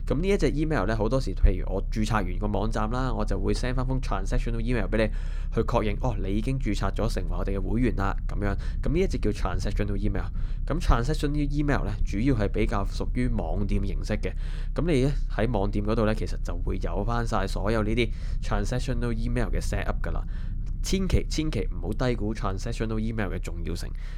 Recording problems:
low rumble; faint; throughout; 25 dB below the speech

